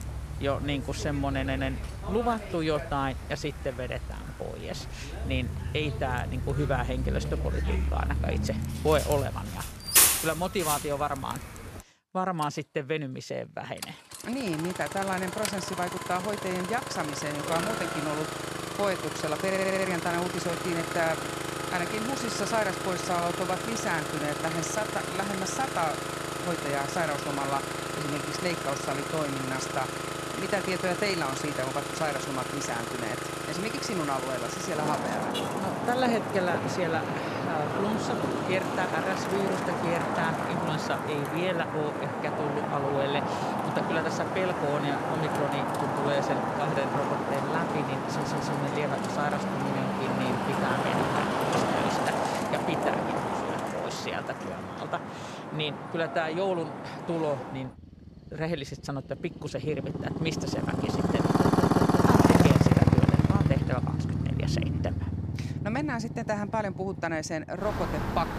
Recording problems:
traffic noise; very loud; throughout; 2 dB above the speech
audio stuttering; 4 times, first at 1.5 s

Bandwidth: 14.5 kHz